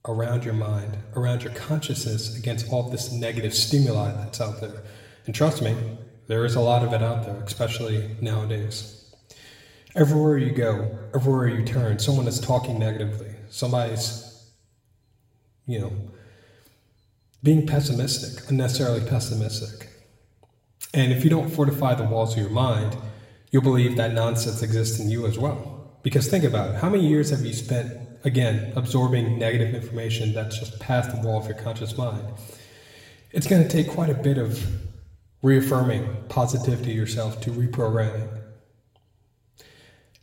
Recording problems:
room echo; slight; dies away in 1 s
off-mic speech; somewhat distant

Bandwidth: 16 kHz